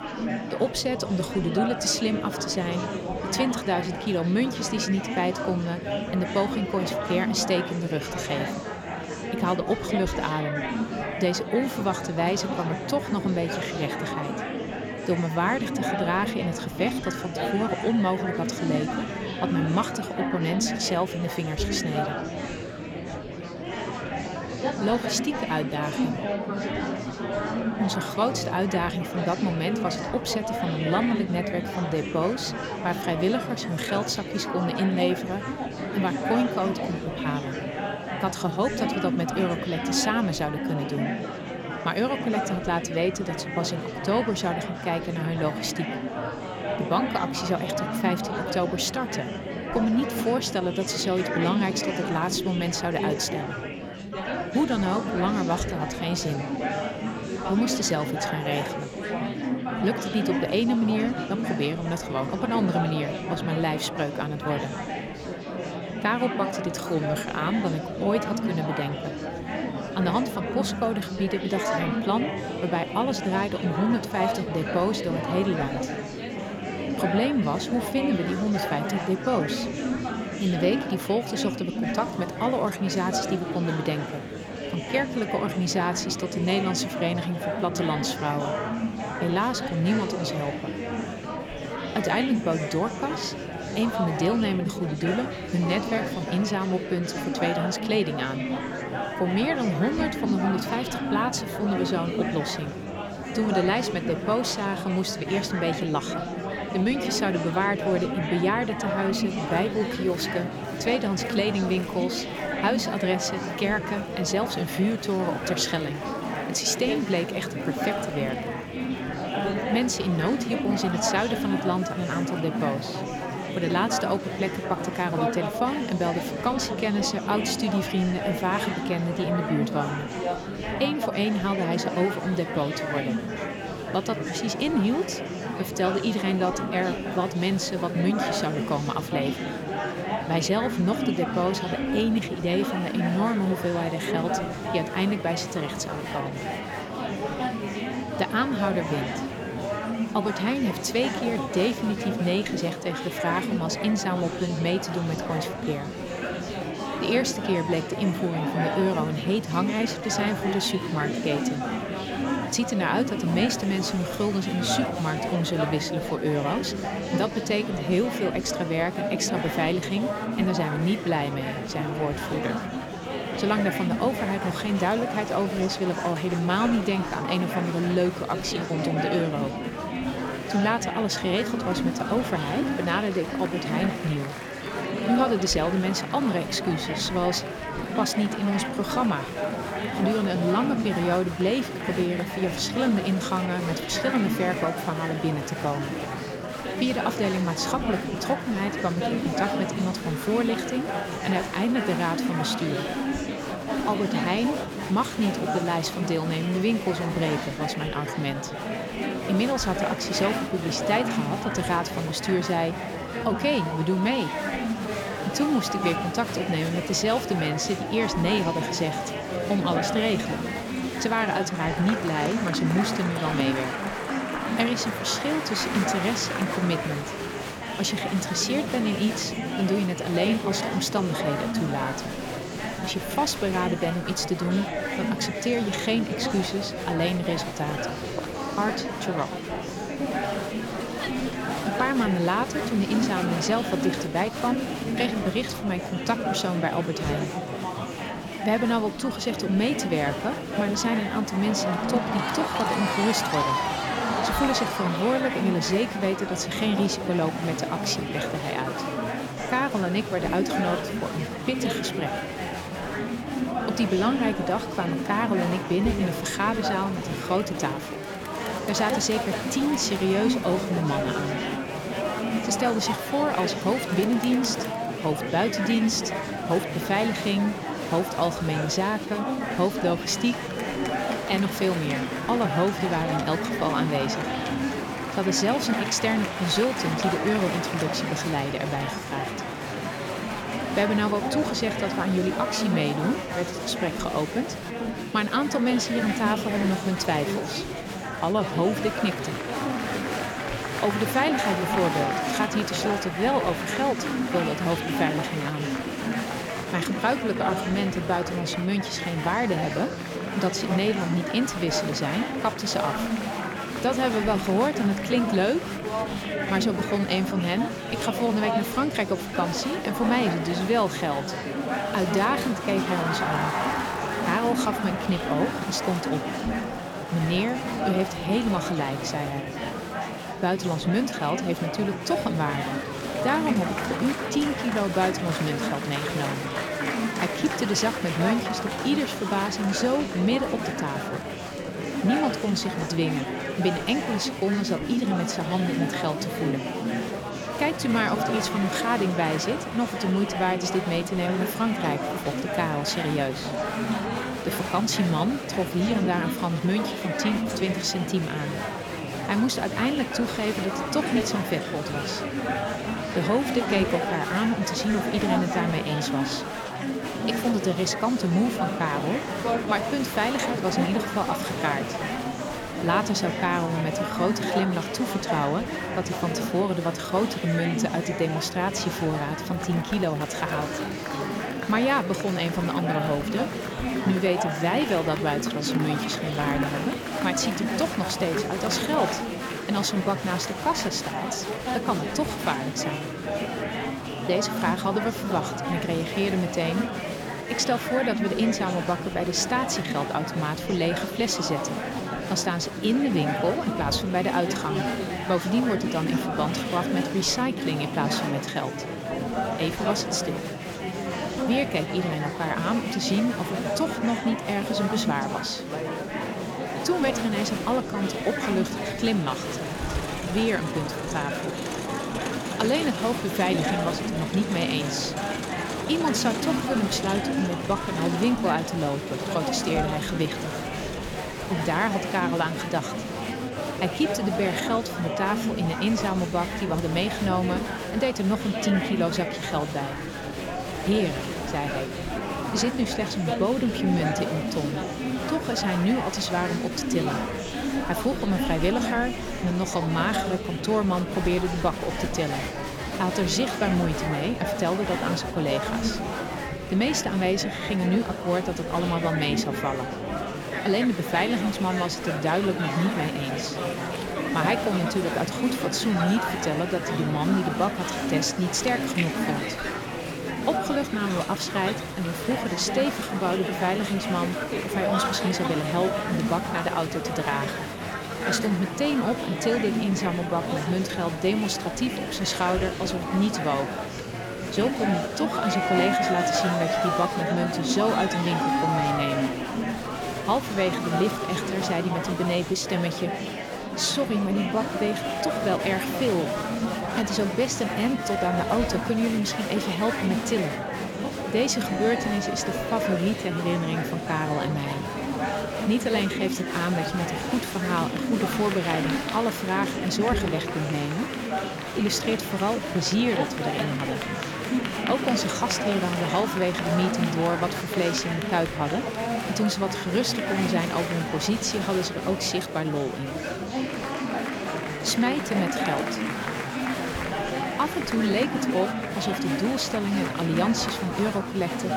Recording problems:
murmuring crowd; loud; throughout; 3 dB below the speech

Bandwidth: 19 kHz